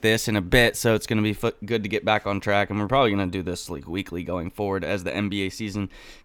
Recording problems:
none

